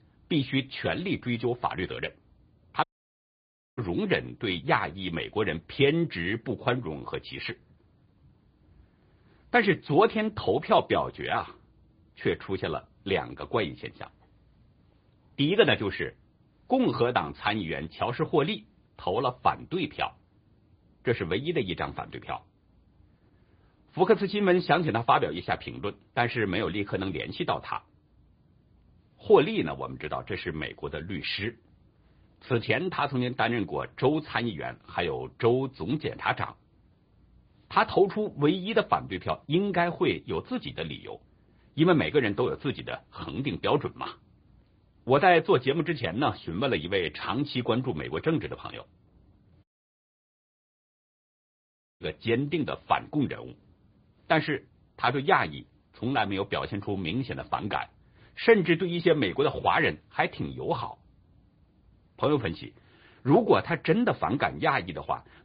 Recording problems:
high frequencies cut off; severe; nothing above 5 kHz
garbled, watery; slightly
audio cutting out; at 3 s for 1 s and at 50 s for 2.5 s

